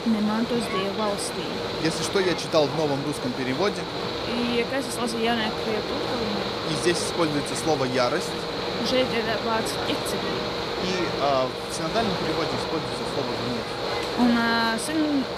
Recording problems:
machinery noise; loud; throughout; 2 dB below the speech
chatter from many people; noticeable; throughout; 10 dB below the speech

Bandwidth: 15 kHz